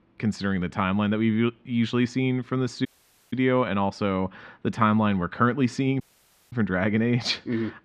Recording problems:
muffled; slightly; fading above 2.5 kHz
audio cutting out; at 3 s and at 6 s for 0.5 s

